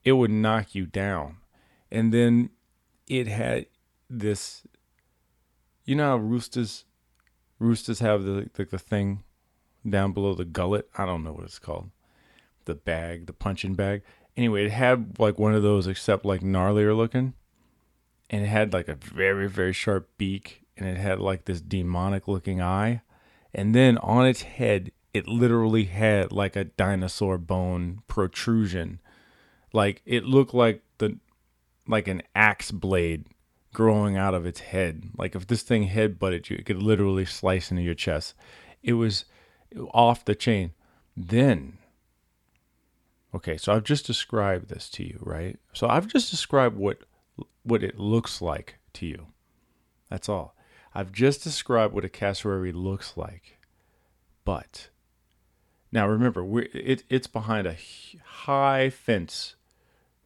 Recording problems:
none

